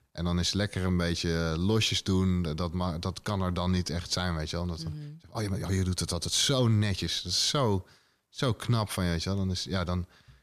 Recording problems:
uneven, jittery; strongly; from 0.5 to 9 s

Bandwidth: 14.5 kHz